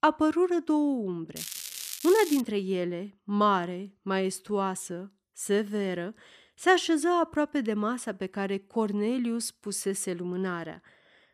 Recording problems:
crackling; loud; from 1.5 to 2.5 s; 8 dB below the speech

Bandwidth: 14.5 kHz